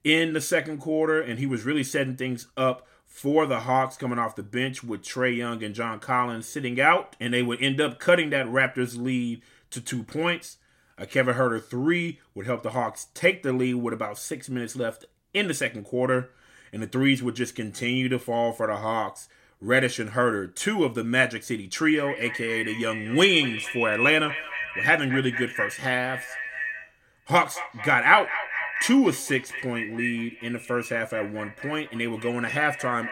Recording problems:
echo of what is said; strong; from 22 s on; 220 ms later, 6 dB below the speech

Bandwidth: 16 kHz